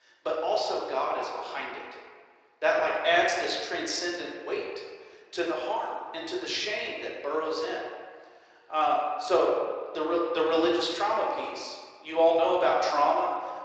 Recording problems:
off-mic speech; far
thin; very; fading below 350 Hz
room echo; noticeable; dies away in 1.4 s
garbled, watery; slightly

